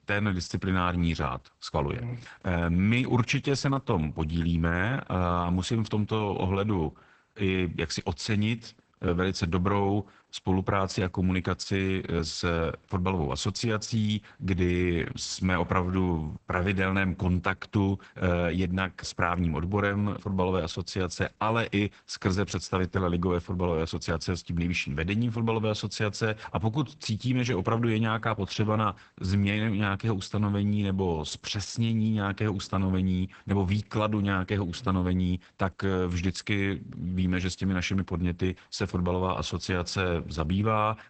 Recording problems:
garbled, watery; badly; nothing above 8 kHz

